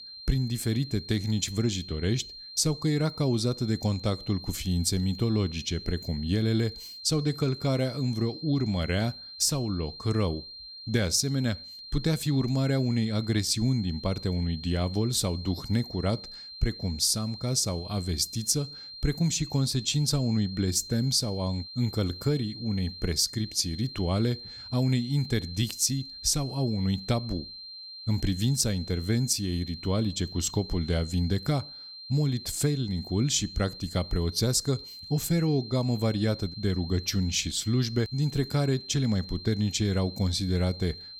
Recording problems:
high-pitched whine; noticeable; throughout; 4 kHz, 15 dB below the speech

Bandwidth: 18.5 kHz